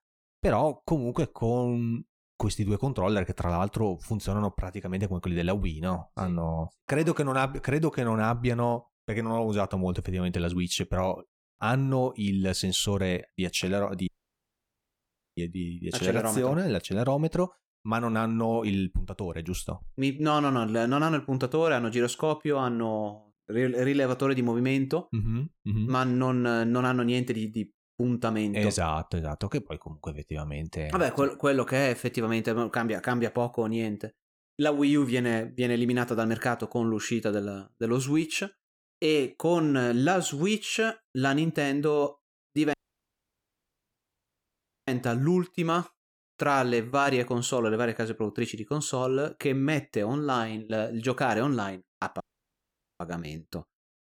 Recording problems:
audio cutting out; at 14 s for 1.5 s, at 43 s for 2 s and at 52 s for 1 s

